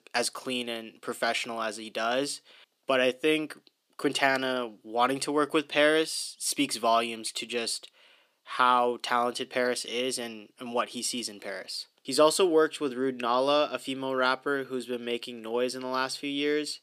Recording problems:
thin; very slightly; fading below 300 Hz

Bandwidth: 15 kHz